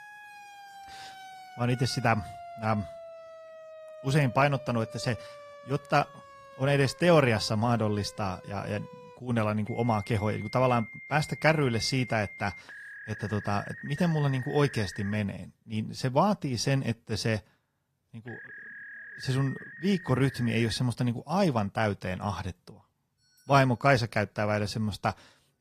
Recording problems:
garbled, watery; slightly; nothing above 14.5 kHz
alarms or sirens; noticeable; throughout; 15 dB below the speech

